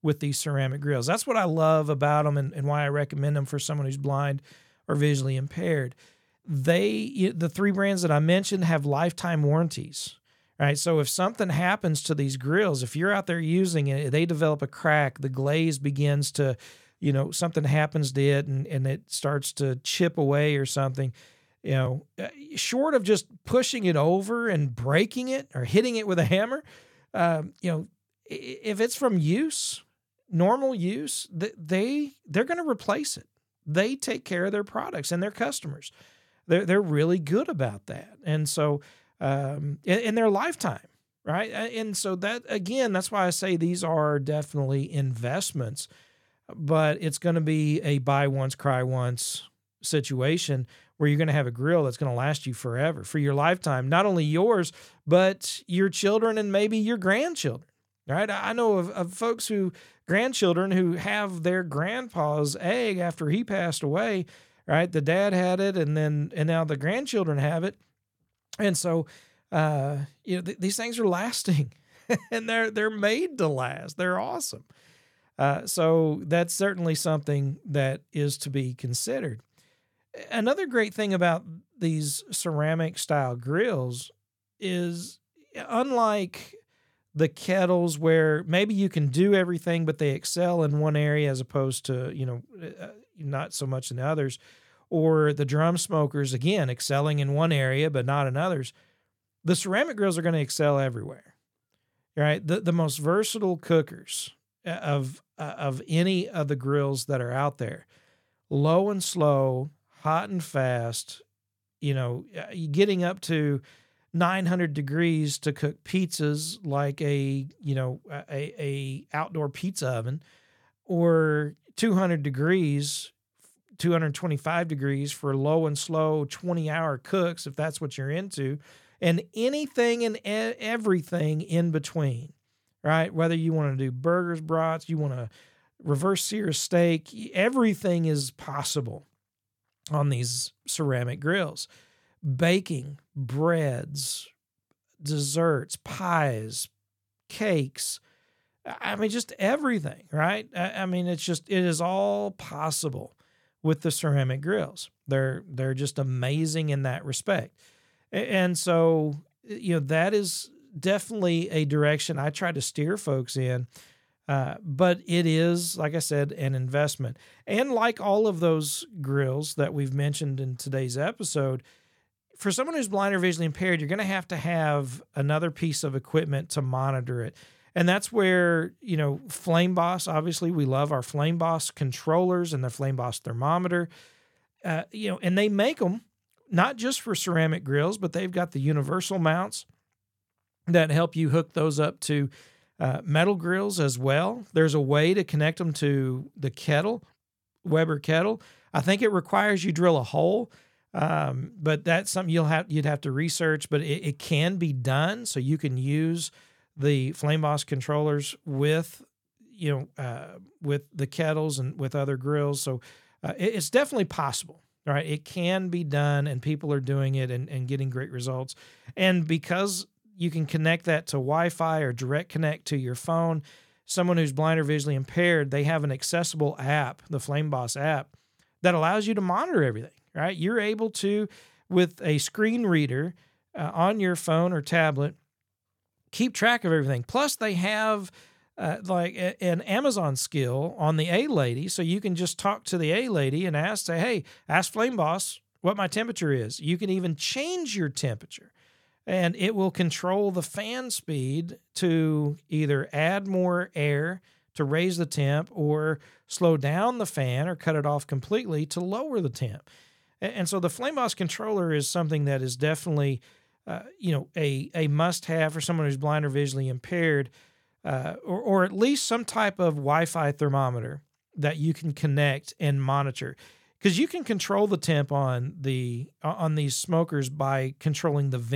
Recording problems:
abrupt cut into speech; at the end

